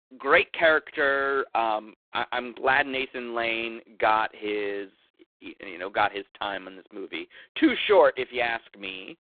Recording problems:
phone-call audio; poor line; nothing above 3.5 kHz

